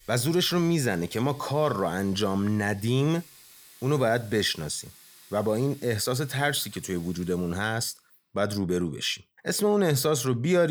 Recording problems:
household noises; faint; until 7.5 s; 25 dB below the speech
abrupt cut into speech; at the end

